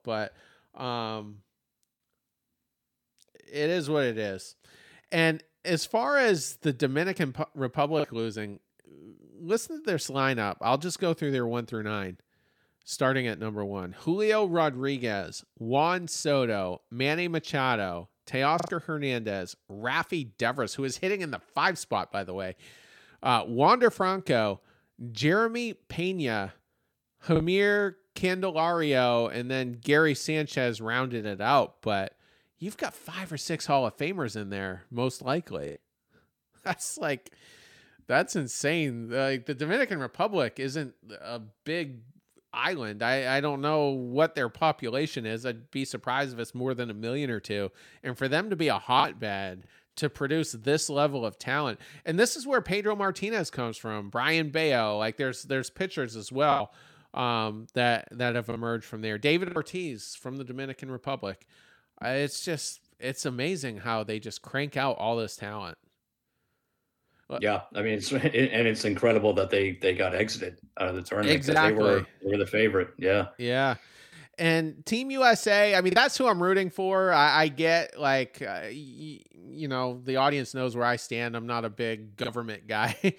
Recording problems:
choppy; occasionally; 1% of the speech affected

